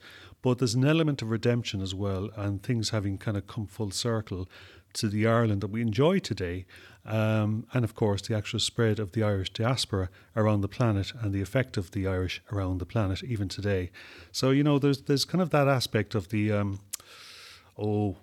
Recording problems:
none

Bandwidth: 18.5 kHz